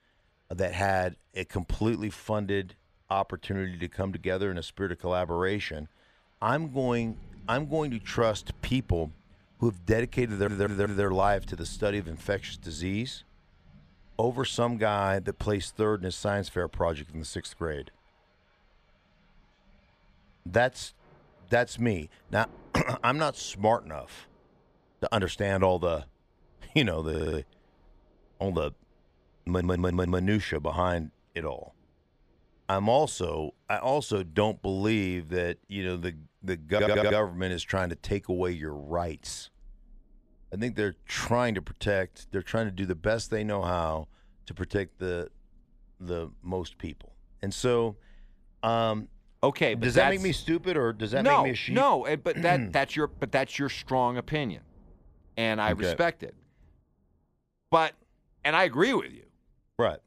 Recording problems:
rain or running water; faint; throughout; 25 dB below the speech
audio stuttering; 4 times, first at 10 s

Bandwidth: 14.5 kHz